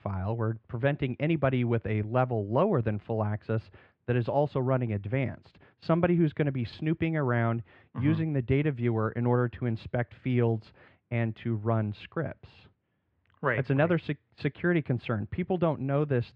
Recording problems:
muffled; very; fading above 2.5 kHz

